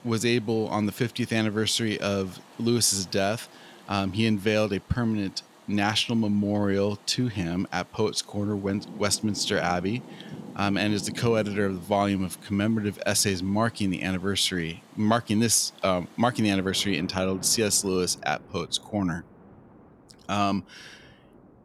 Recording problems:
rain or running water; faint; throughout; 20 dB below the speech

